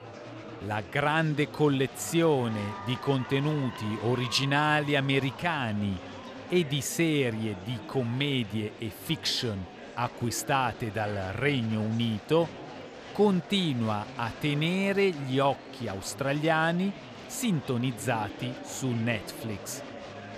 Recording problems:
murmuring crowd; noticeable; throughout; 15 dB below the speech

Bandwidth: 14.5 kHz